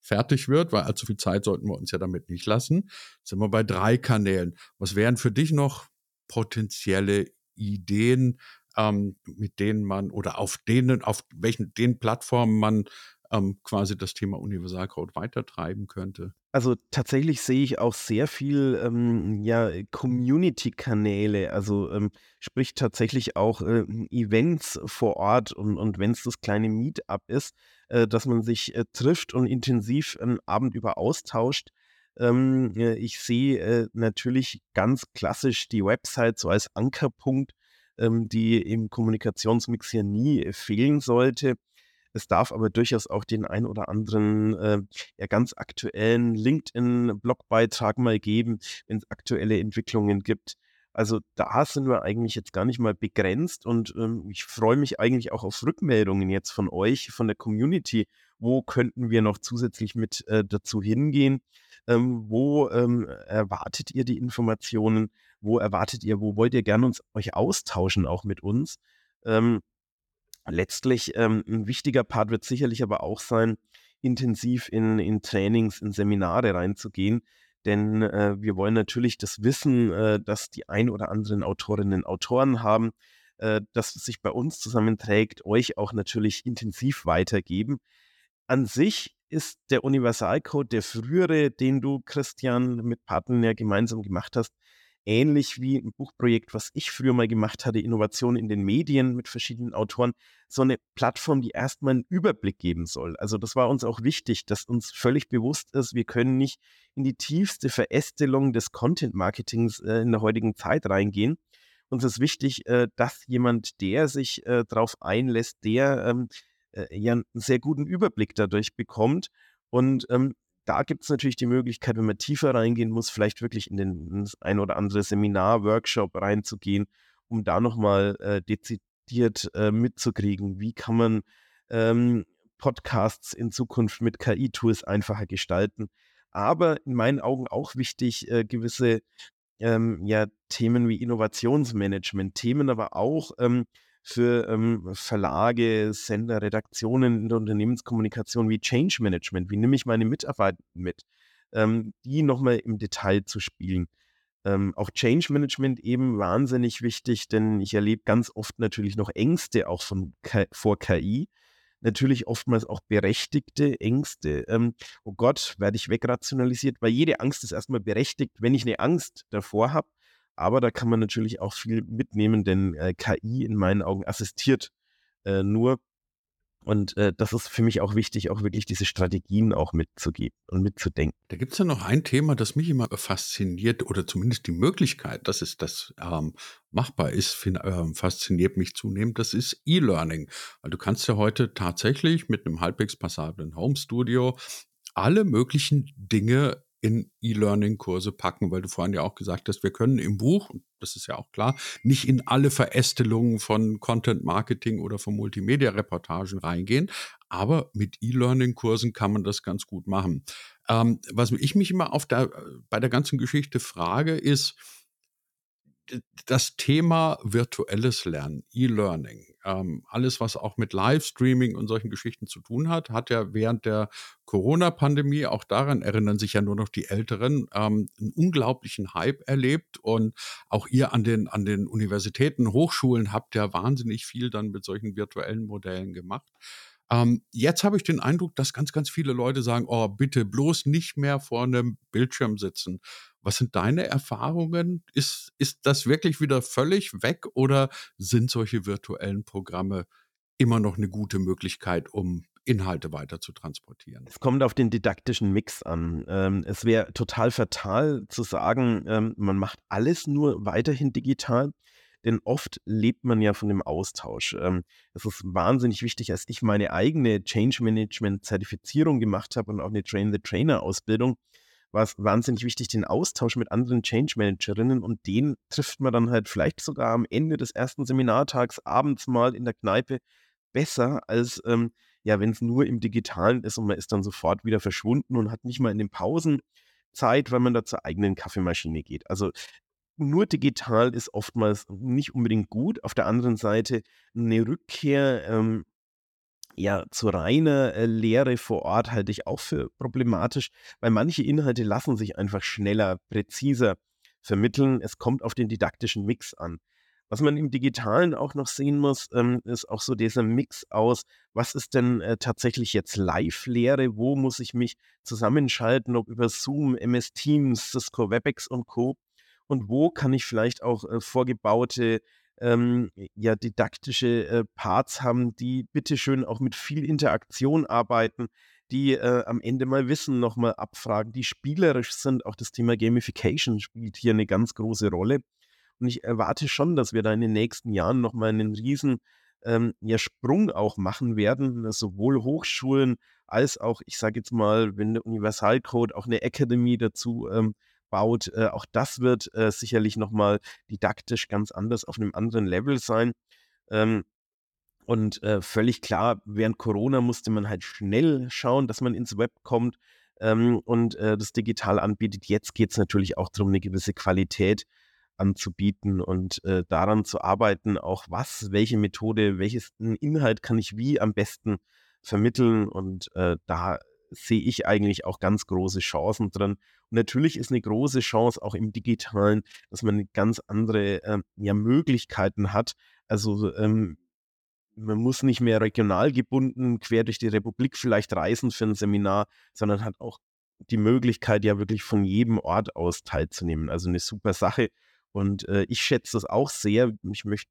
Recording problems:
none

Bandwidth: 17.5 kHz